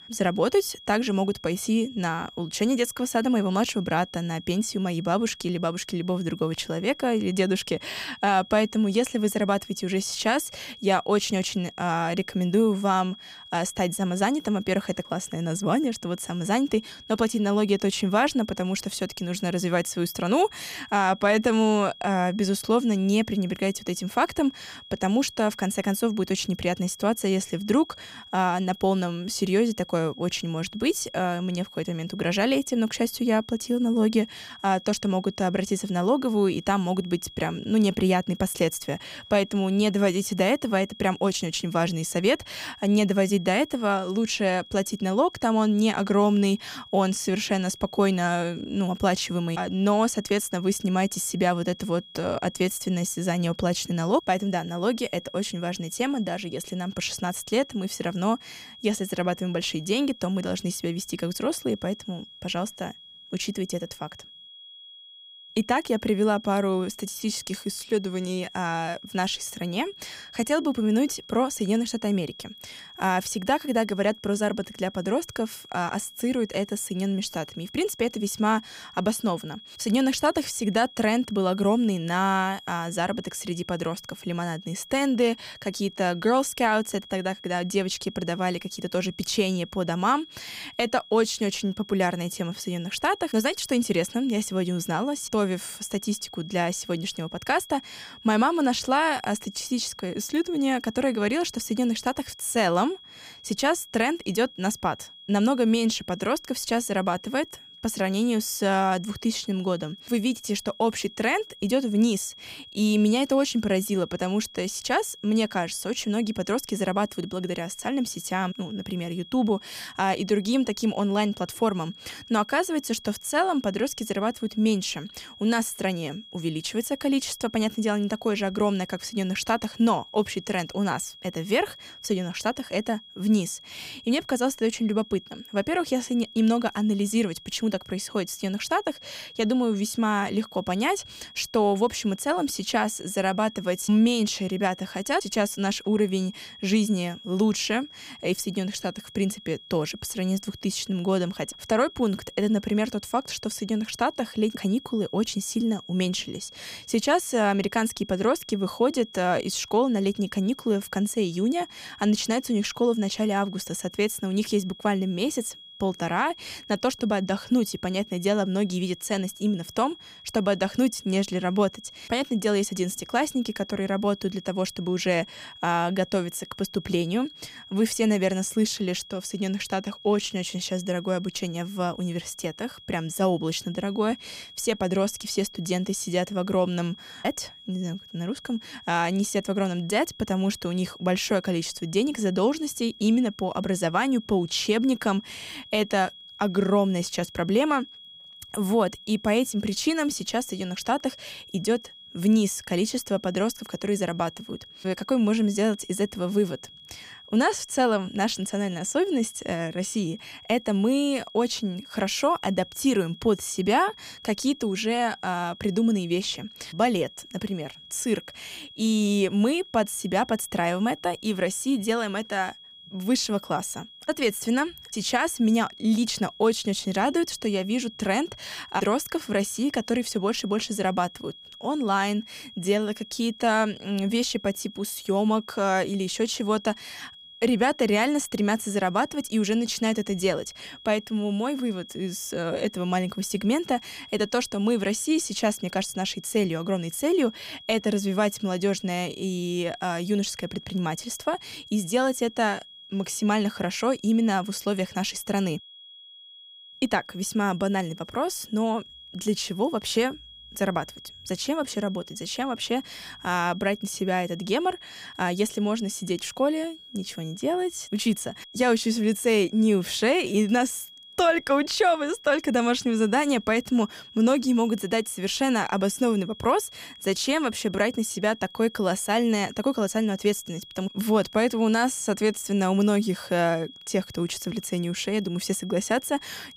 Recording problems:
high-pitched whine; noticeable; throughout; 3.5 kHz, 20 dB below the speech

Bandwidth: 15 kHz